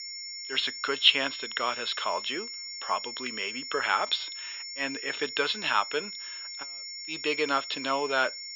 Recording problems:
thin; very; fading below 750 Hz
muffled; very slightly; fading above 3.5 kHz
high-pitched whine; loud; throughout; 5.5 kHz, 8 dB below the speech

